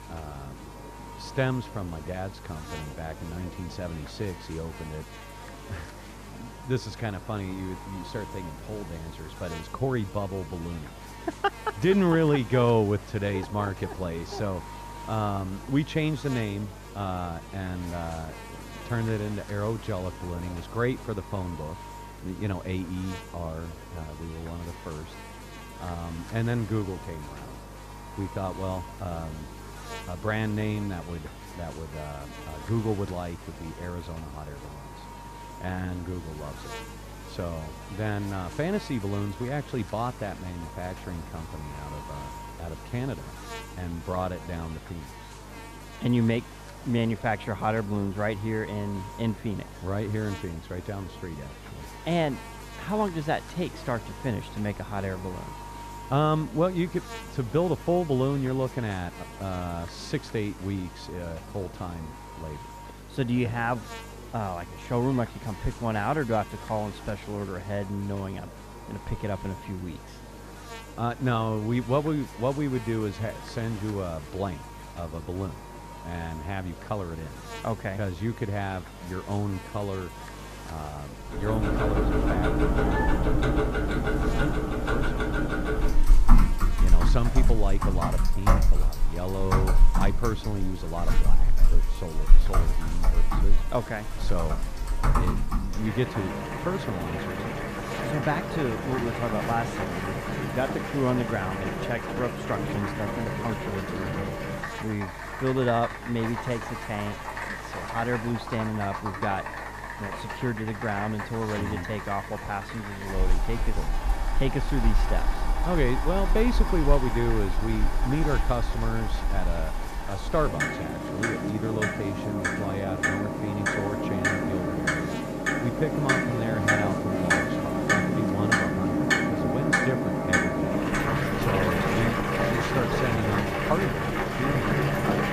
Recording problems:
muffled; slightly; fading above 2 kHz
household noises; very loud; from 1:22 on; 3 dB above the speech
electrical hum; loud; throughout; 50 Hz, 10 dB below the speech
murmuring crowd; noticeable; throughout; 20 dB below the speech

